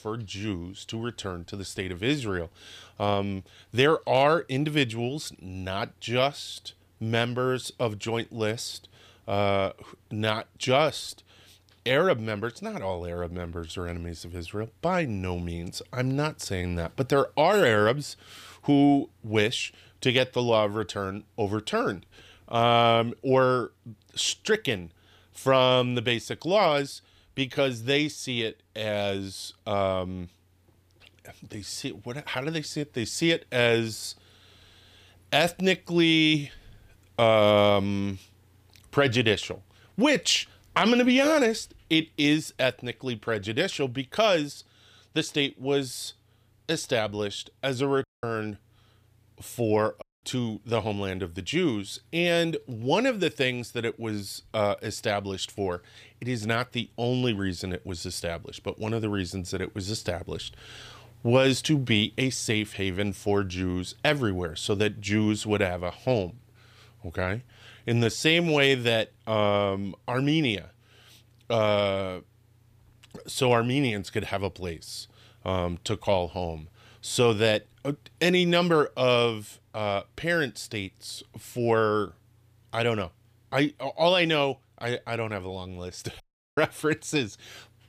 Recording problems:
audio cutting out; at 48 s, at 50 s and at 1:26

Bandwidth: 15 kHz